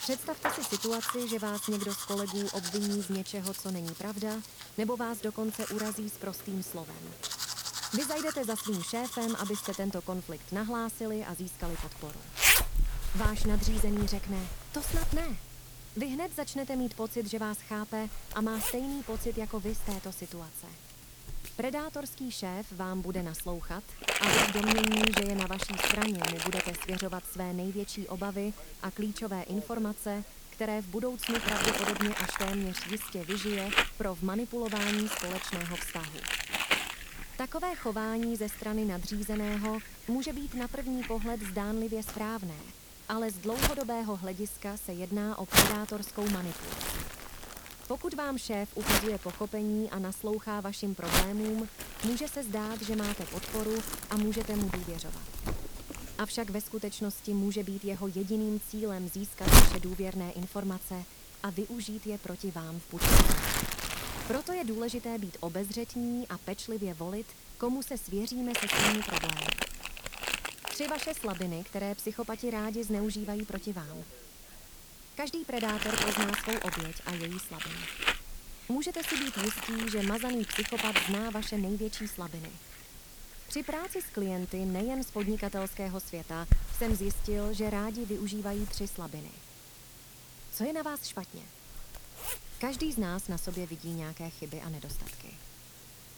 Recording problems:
household noises; very loud; throughout; 4 dB above the speech
hiss; noticeable; throughout; 15 dB below the speech

